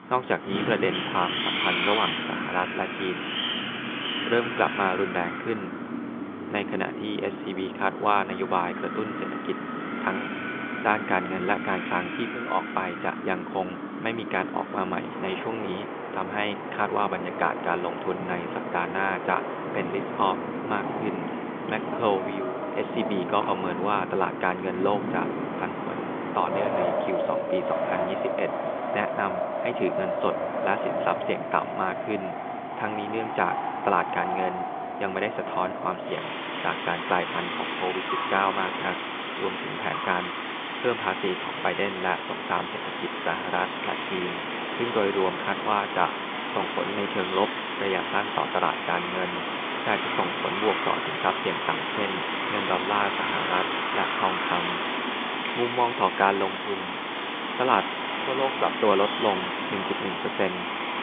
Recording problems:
phone-call audio; nothing above 3.5 kHz
wind in the background; loud; throughout; 1 dB below the speech

